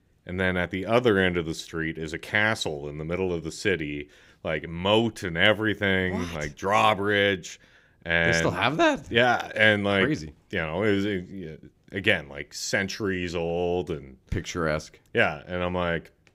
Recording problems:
none

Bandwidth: 15.5 kHz